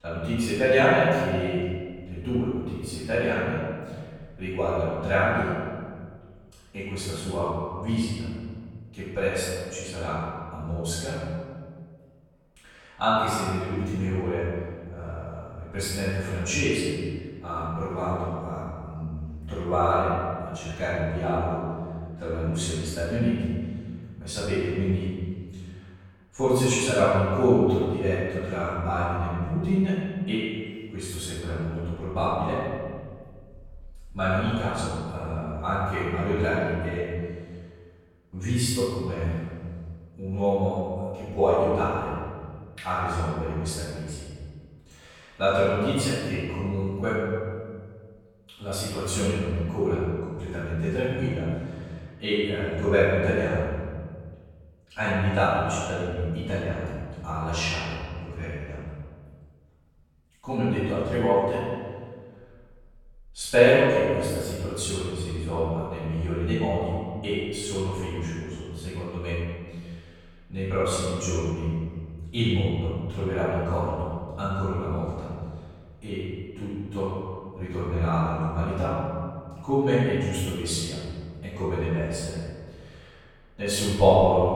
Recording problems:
room echo; strong; dies away in 1.7 s
off-mic speech; far
echo of what is said; noticeable; throughout; 120 ms later, 10 dB below the speech

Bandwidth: 17.5 kHz